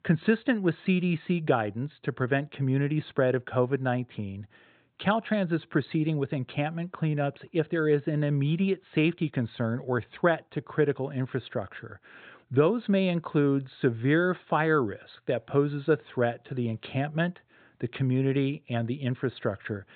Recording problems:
high frequencies cut off; severe; nothing above 4 kHz

